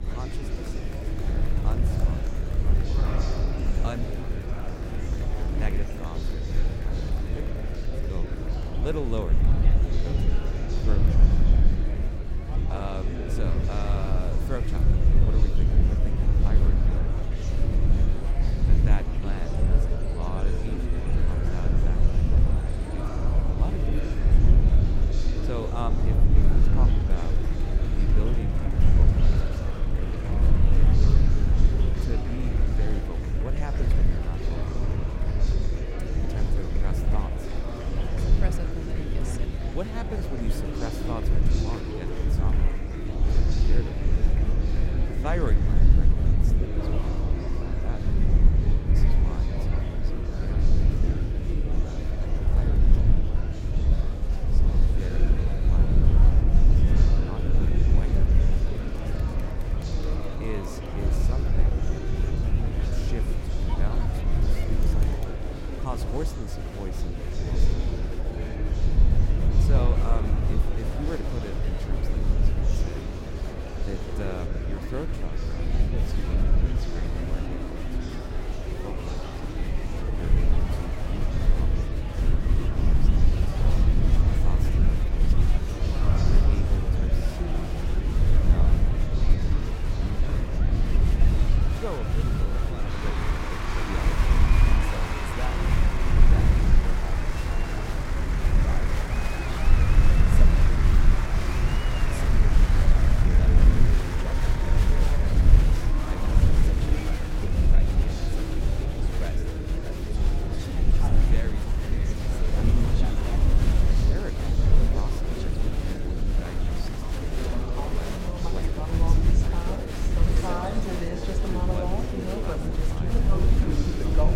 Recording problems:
echo of what is said; faint; throughout; 160 ms later, 25 dB below the speech
murmuring crowd; very loud; throughout; 4 dB above the speech
low rumble; loud; throughout; as loud as the speech

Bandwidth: 16 kHz